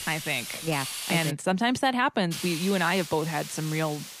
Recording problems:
hiss; loud; until 1.5 s and from 2.5 s on; 8 dB below the speech

